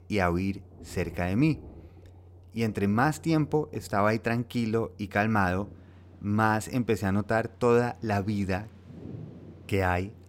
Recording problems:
rain or running water; faint; throughout; 20 dB below the speech

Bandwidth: 16 kHz